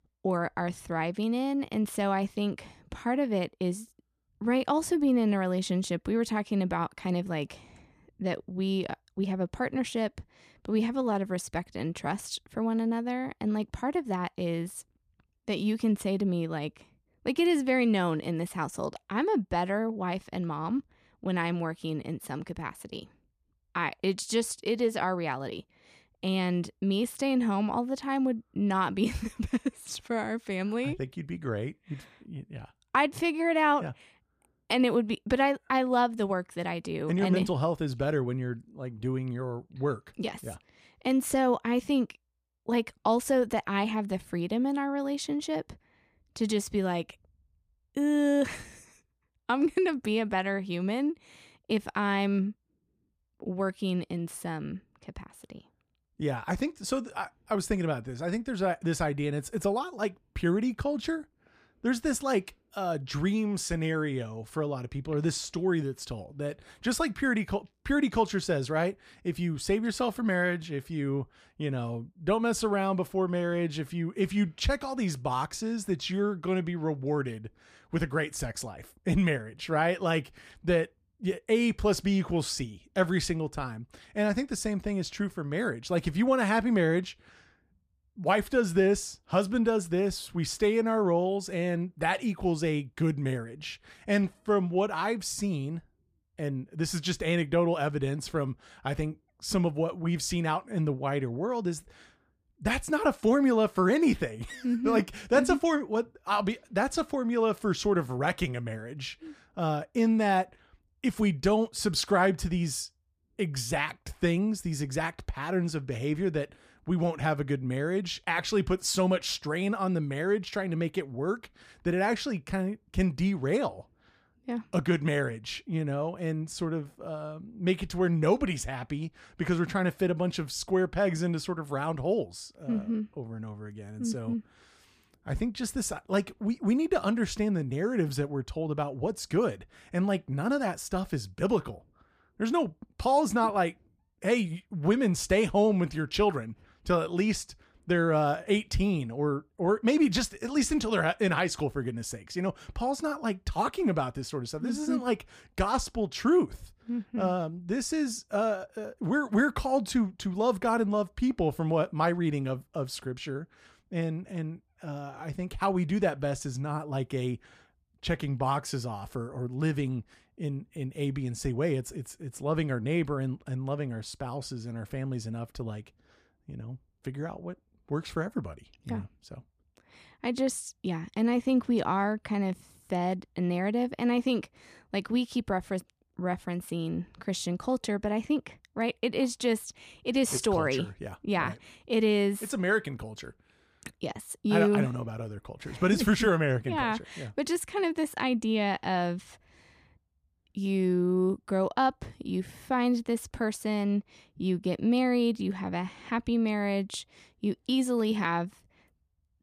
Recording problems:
none

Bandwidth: 15 kHz